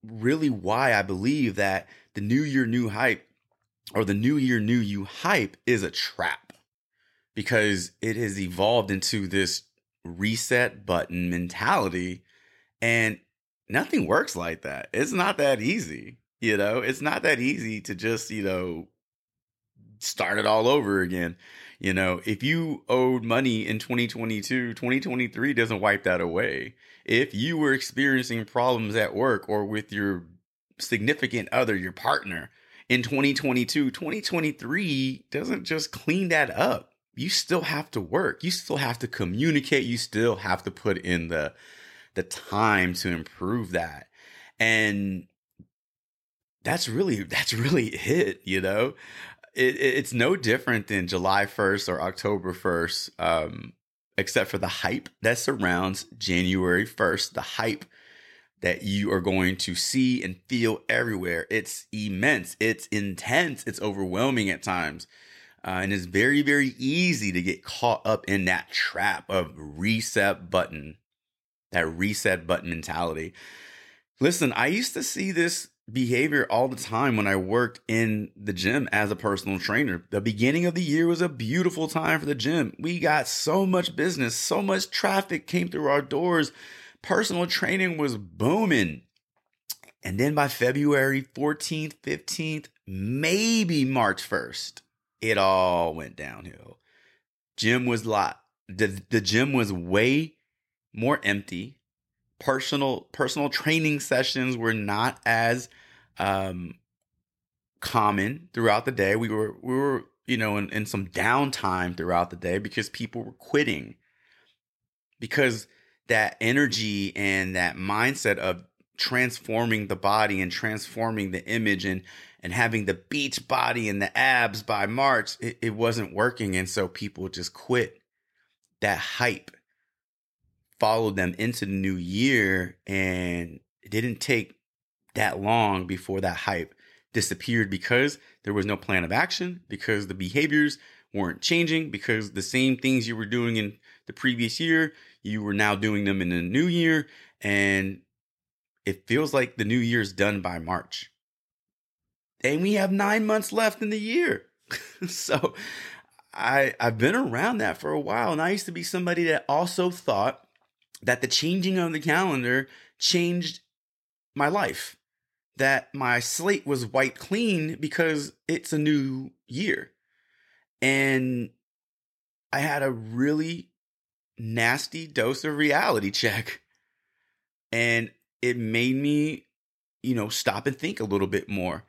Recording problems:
none

